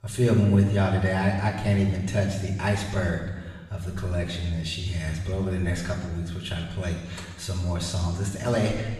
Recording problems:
off-mic speech; far
room echo; noticeable; dies away in 1.2 s

